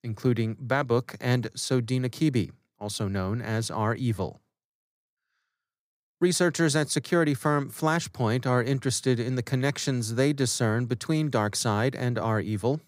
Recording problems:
none

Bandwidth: 15.5 kHz